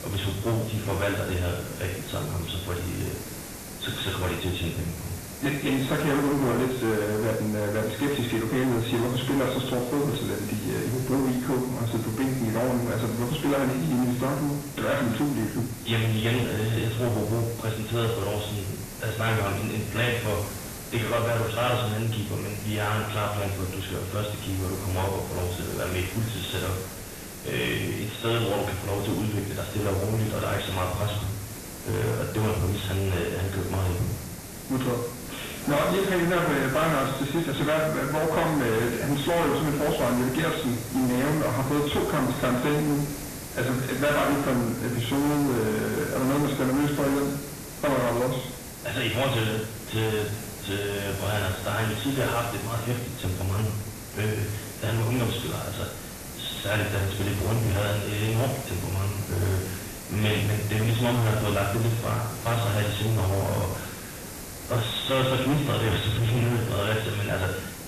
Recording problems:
distortion; heavy; 7 dB below the speech
garbled, watery; badly; nothing above 4 kHz
room echo; slight; dies away in 0.7 s
off-mic speech; somewhat distant
hiss; noticeable; throughout; 10 dB below the speech

